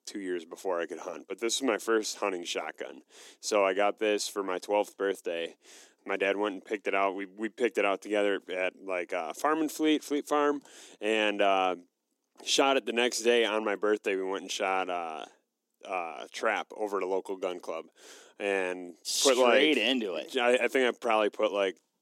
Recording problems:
thin; somewhat; fading below 300 Hz

